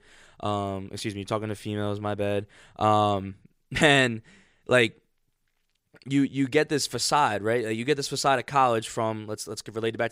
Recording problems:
none

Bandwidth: 15.5 kHz